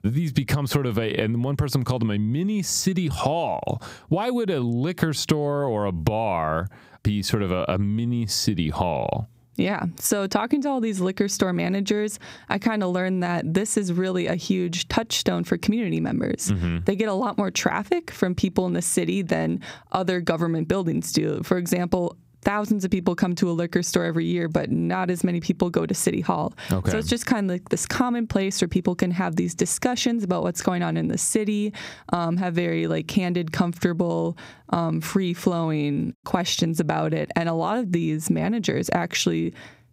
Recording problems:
squashed, flat; somewhat

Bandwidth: 15.5 kHz